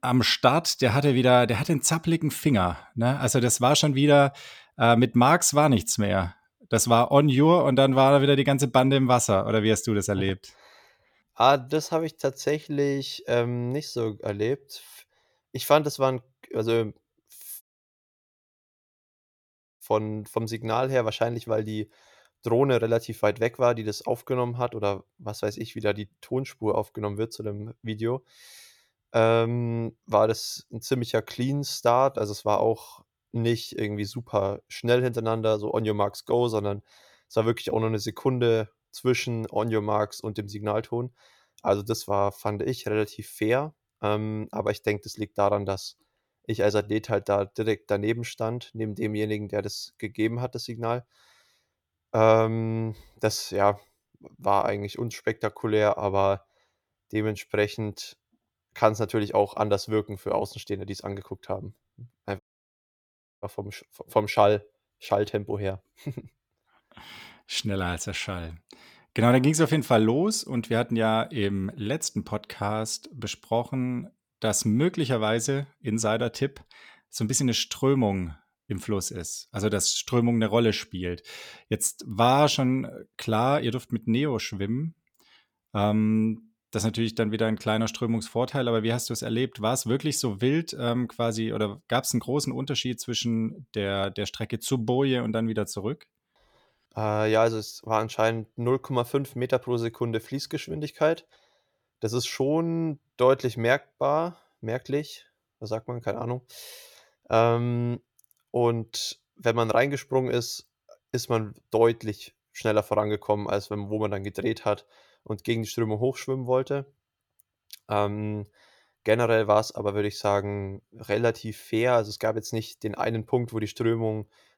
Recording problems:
audio cutting out; at 18 s for 2 s and at 1:02 for 1 s

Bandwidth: 18.5 kHz